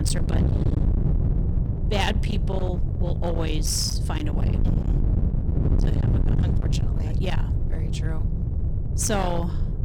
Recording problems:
distortion; heavy; 31% of the sound clipped
wind noise on the microphone; heavy; 6 dB below the speech
abrupt cut into speech; at the start

